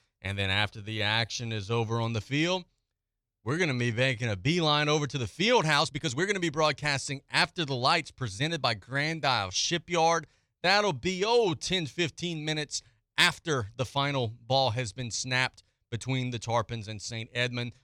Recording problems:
uneven, jittery; strongly; from 0.5 to 12 s

